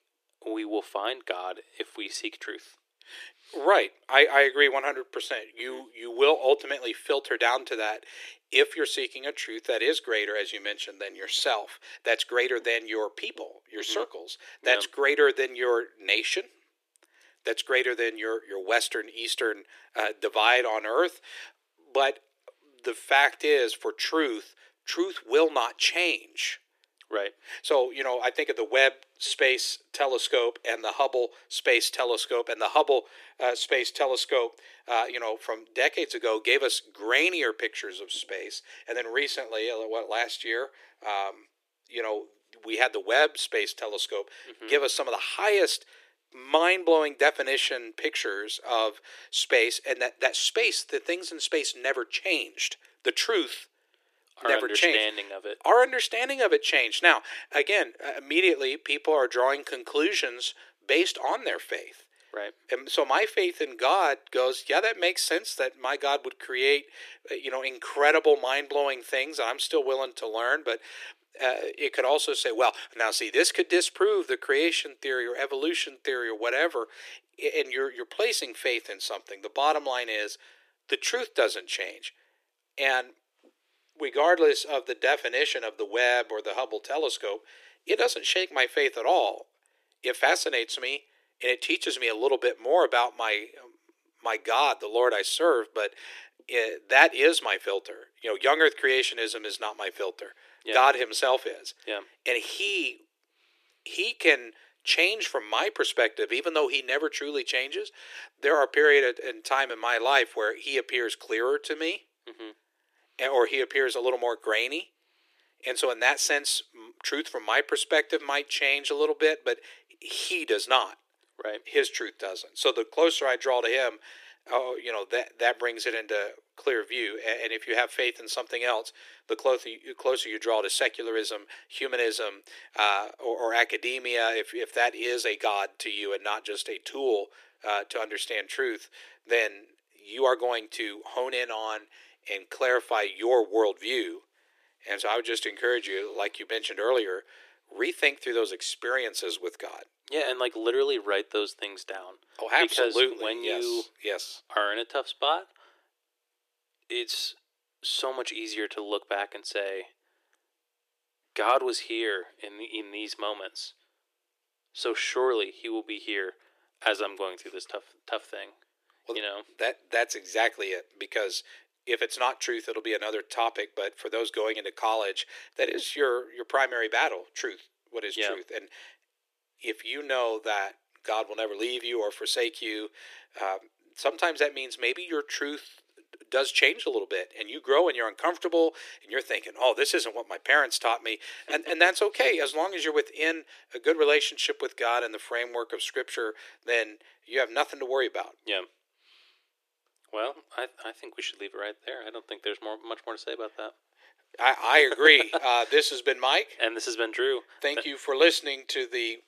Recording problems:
thin; very; fading below 350 Hz

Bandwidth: 14.5 kHz